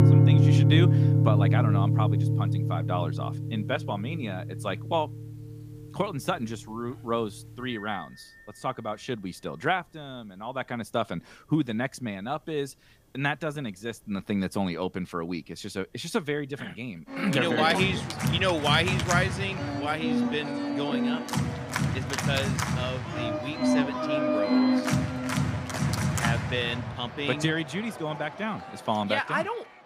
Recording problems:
background music; very loud; throughout; 4 dB above the speech

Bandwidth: 15 kHz